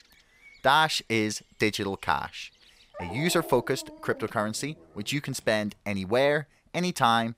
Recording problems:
animal sounds; noticeable; throughout; 20 dB below the speech

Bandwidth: 15.5 kHz